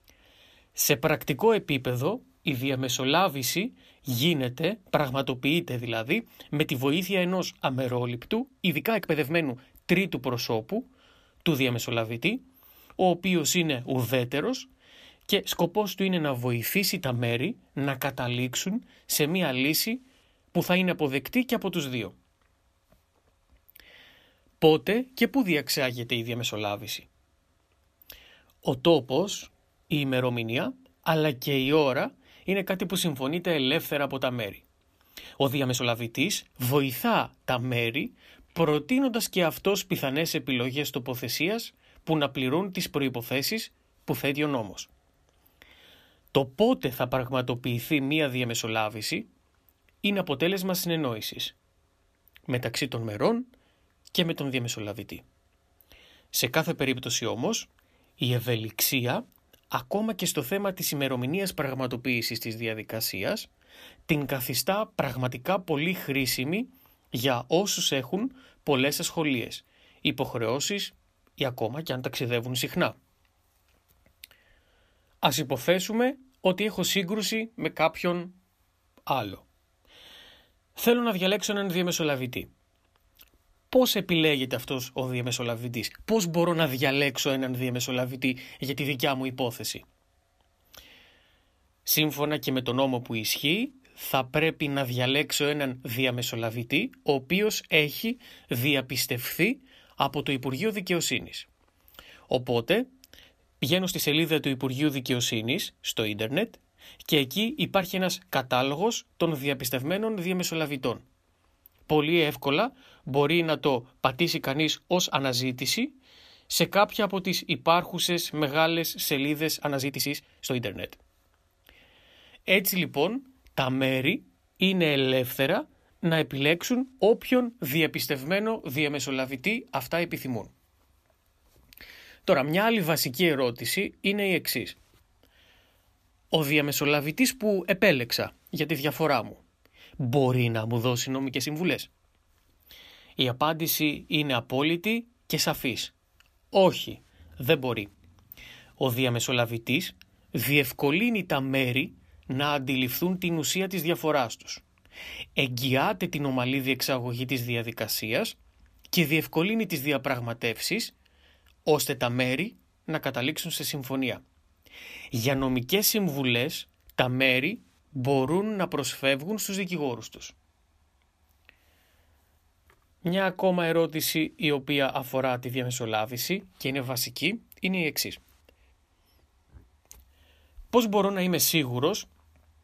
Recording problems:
uneven, jittery; strongly; from 6.5 s to 2:53

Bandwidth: 14.5 kHz